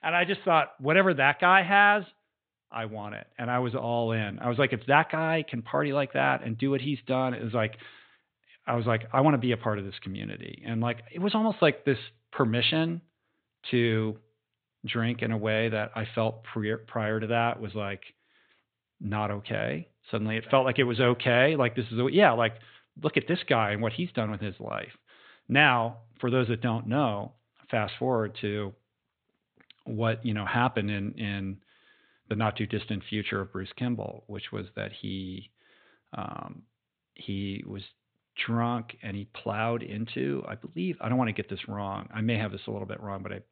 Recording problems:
high frequencies cut off; severe; nothing above 4 kHz

